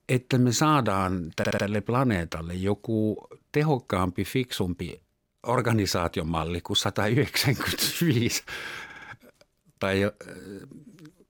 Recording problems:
audio stuttering; at 1.5 s and at 9 s

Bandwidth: 17.5 kHz